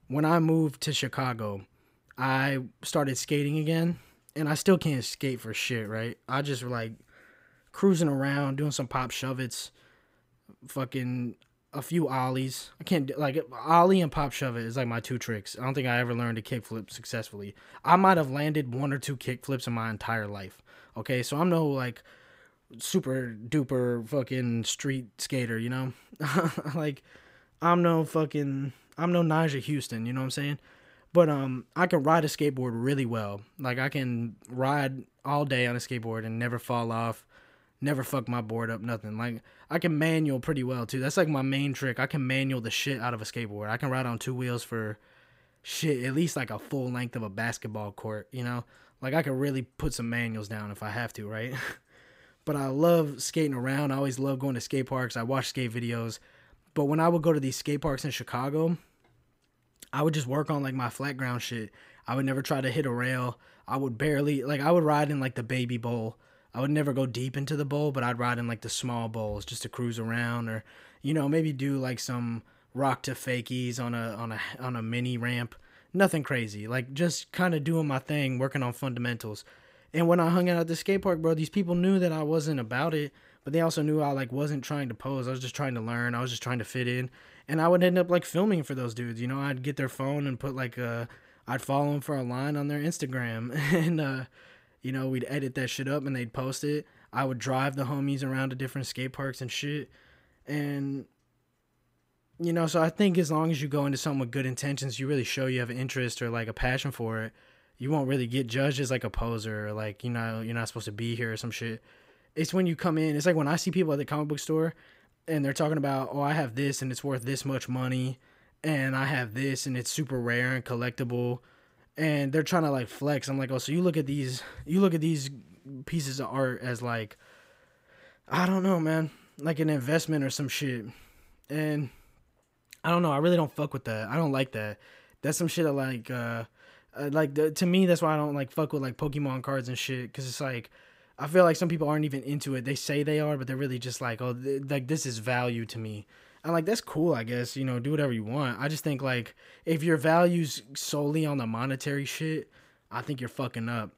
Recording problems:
none

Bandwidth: 15.5 kHz